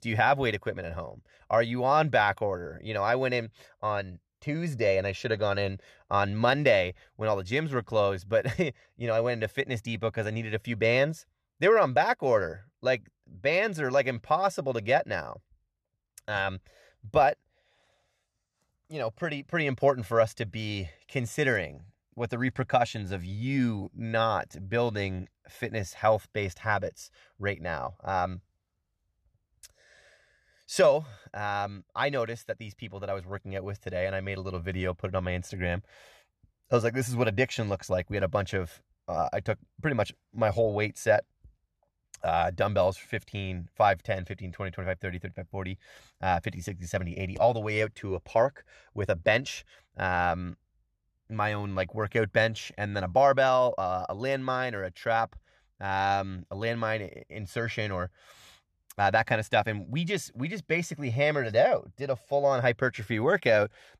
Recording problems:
none

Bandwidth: 13.5 kHz